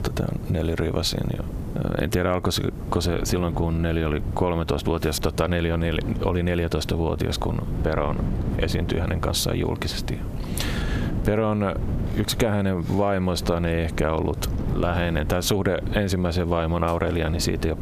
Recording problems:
squashed, flat; heavily
wind noise on the microphone; occasional gusts; 15 dB below the speech

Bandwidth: 14 kHz